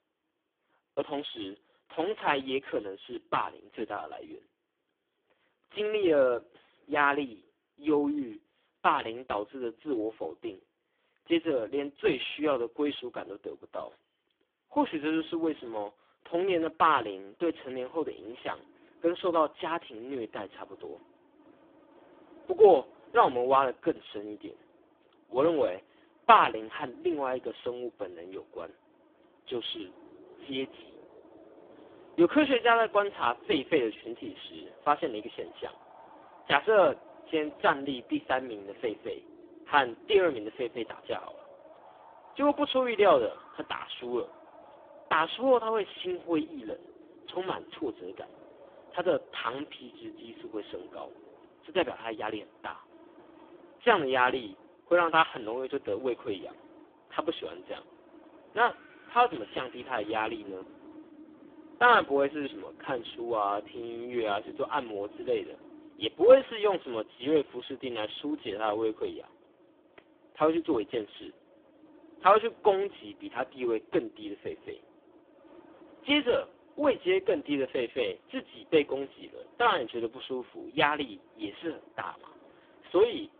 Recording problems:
phone-call audio; poor line; nothing above 3.5 kHz
wind in the background; faint; from 17 s on; 25 dB below the speech

